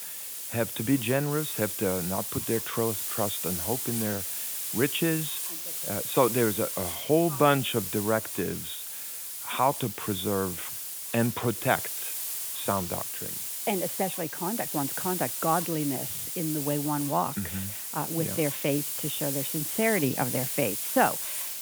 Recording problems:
high frequencies cut off; severe; nothing above 4 kHz
hiss; loud; throughout; 1 dB below the speech

